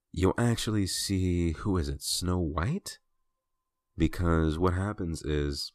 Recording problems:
none

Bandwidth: 14.5 kHz